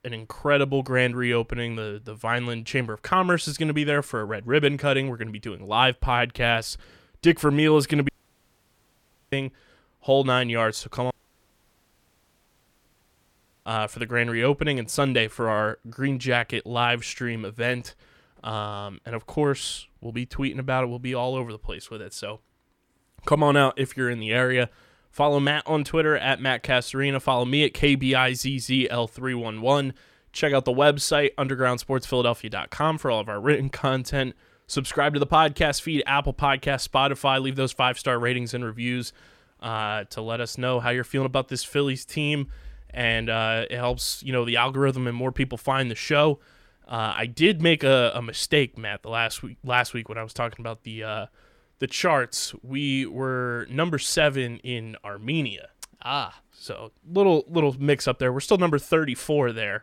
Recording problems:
audio cutting out; at 8 s for 1 s and at 11 s for 2.5 s

